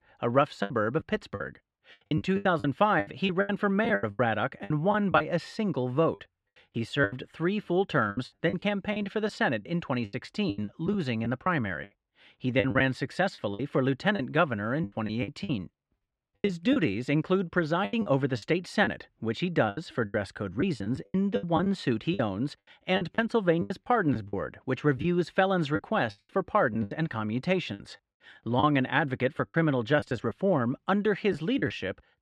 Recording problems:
muffled; slightly; fading above 2.5 kHz
choppy; very; 12% of the speech affected

